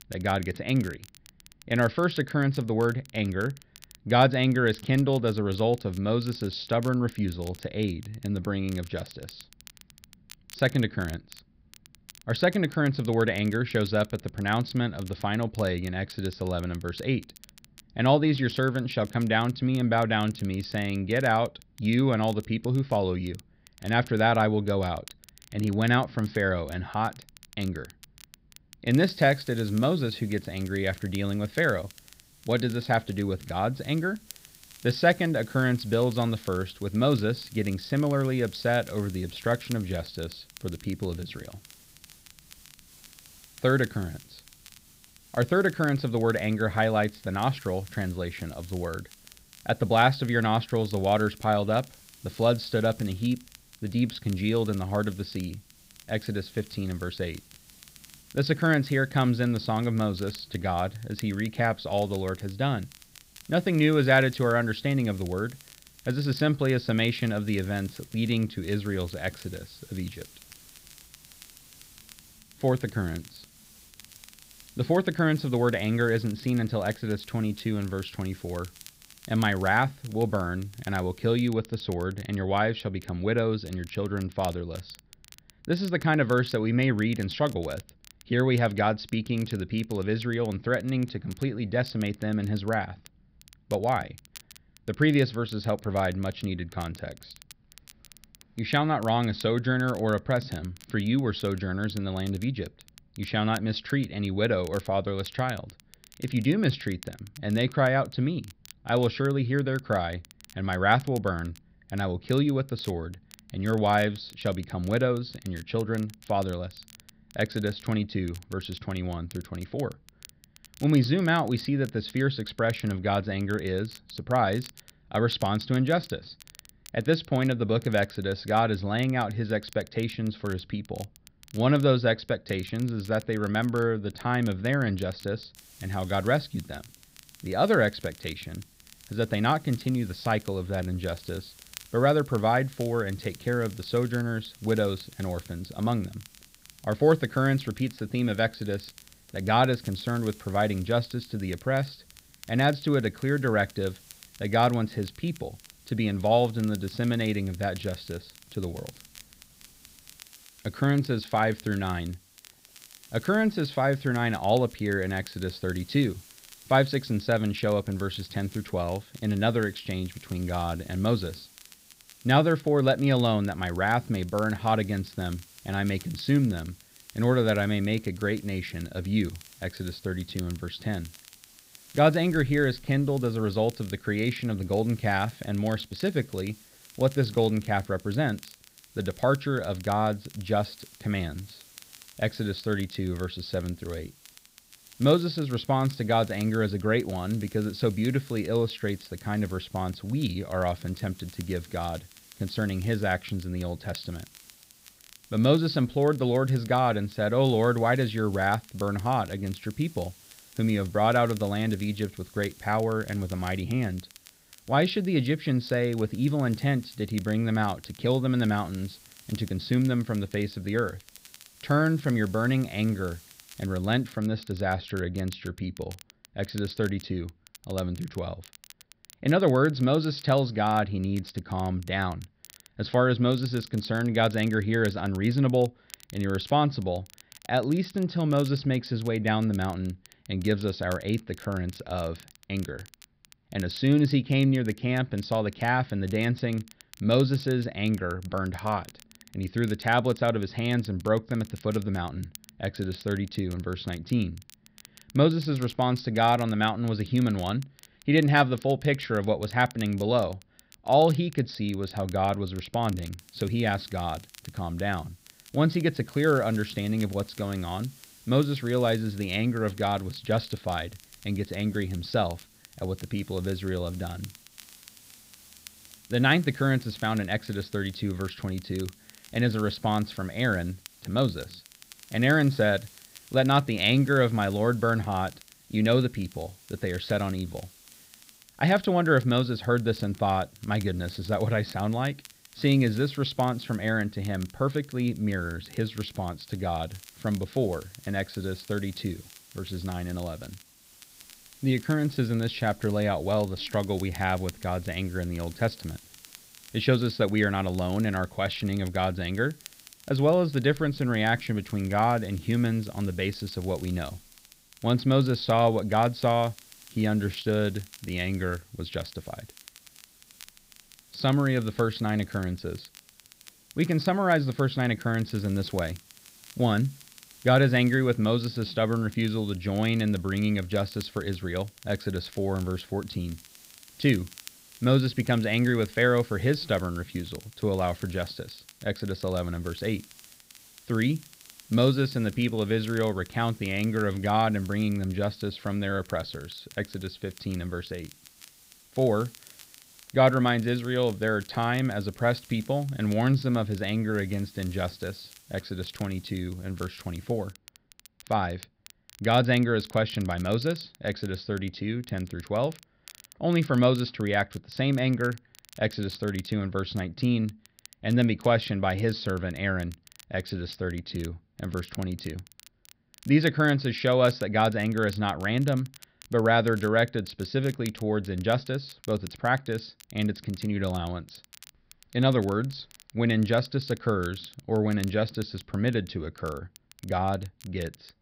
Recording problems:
high frequencies cut off; noticeable; nothing above 5.5 kHz
hiss; faint; from 29 s to 1:21, from 2:16 to 3:44 and from 4:23 to 5:58; 25 dB below the speech
crackle, like an old record; faint; 25 dB below the speech

